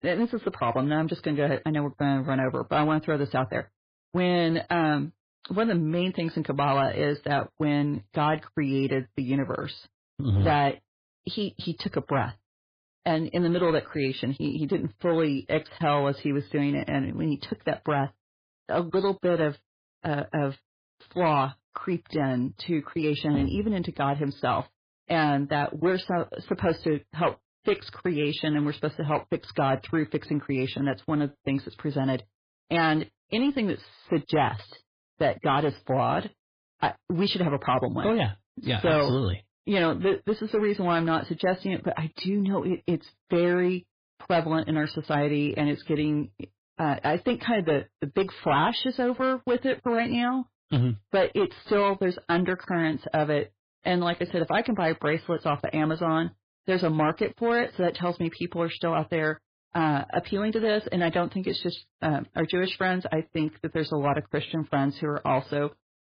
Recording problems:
garbled, watery; badly; nothing above 4 kHz
distortion; slight; 6% of the sound clipped

